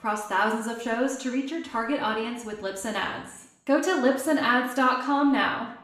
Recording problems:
room echo; slight; dies away in 0.7 s
off-mic speech; somewhat distant

